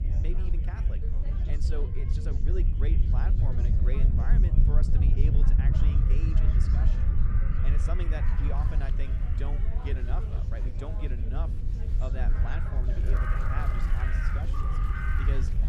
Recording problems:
wind noise on the microphone; heavy; 1 dB below the speech
animal sounds; loud; throughout; 1 dB below the speech
chatter from many people; loud; throughout; 7 dB below the speech

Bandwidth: 14.5 kHz